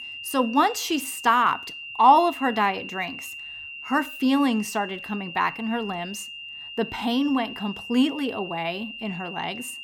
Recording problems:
high-pitched whine; noticeable; throughout; 3 kHz, 10 dB below the speech

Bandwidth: 17 kHz